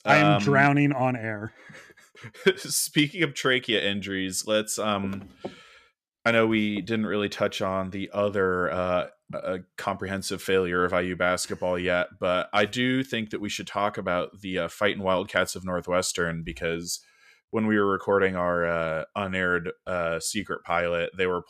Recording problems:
none

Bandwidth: 14.5 kHz